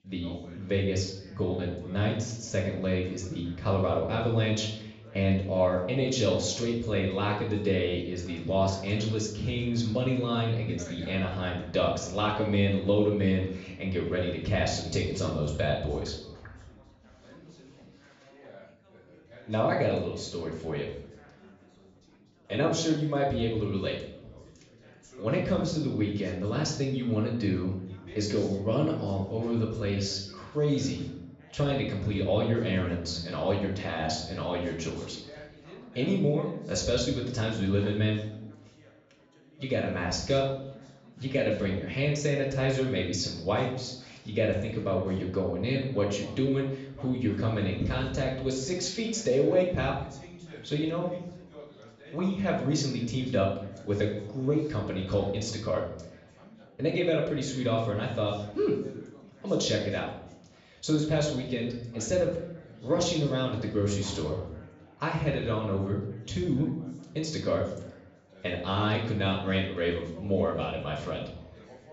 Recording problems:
off-mic speech; far
high frequencies cut off; noticeable; nothing above 8 kHz
room echo; slight; dies away in 0.7 s
background chatter; faint; throughout; 4 voices, 20 dB below the speech

